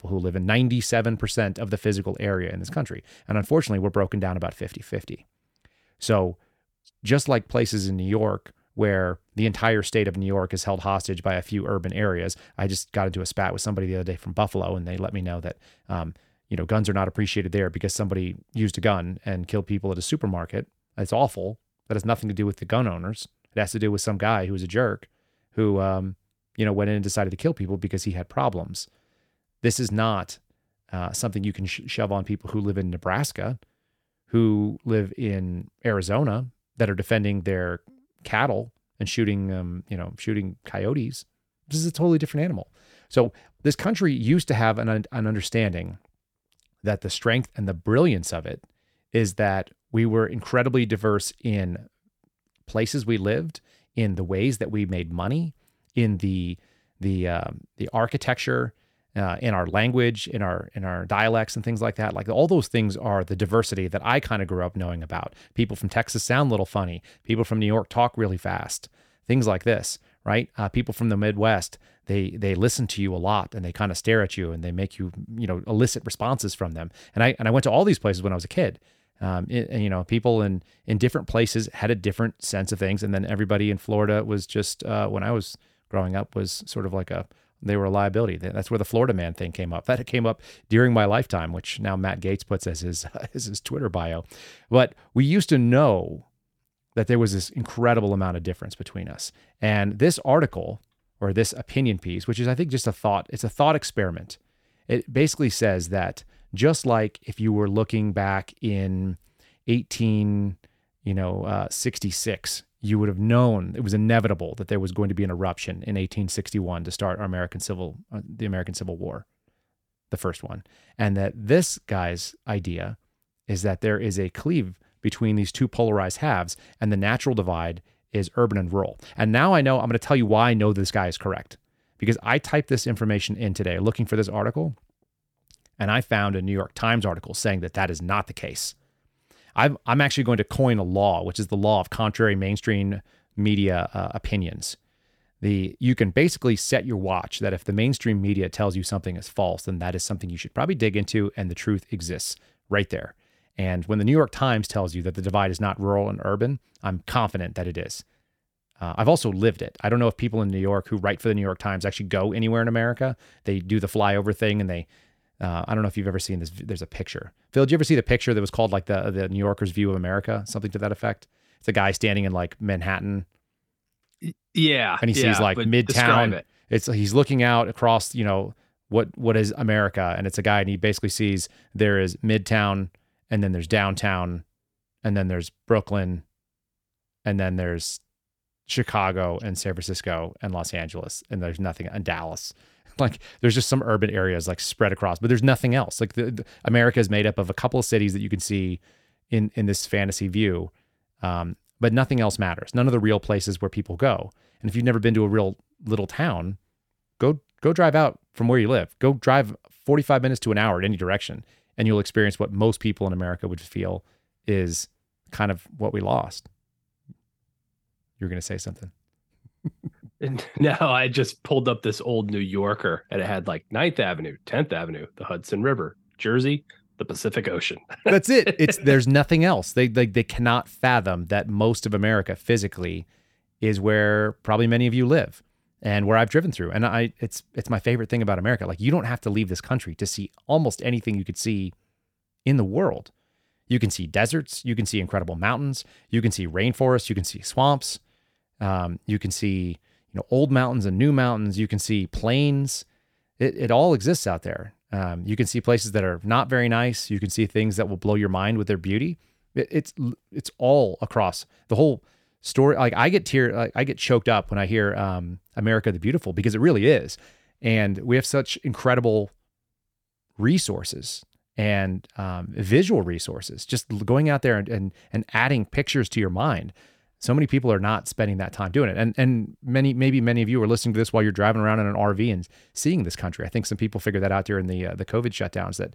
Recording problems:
none

